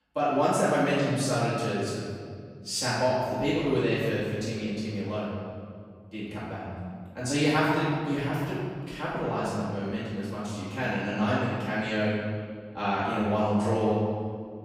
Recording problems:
room echo; strong; dies away in 2 s
off-mic speech; far

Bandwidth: 15 kHz